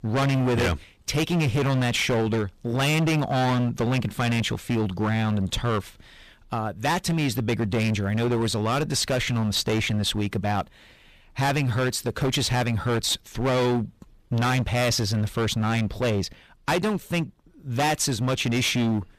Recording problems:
distortion; heavy; 20% of the sound clipped

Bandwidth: 14.5 kHz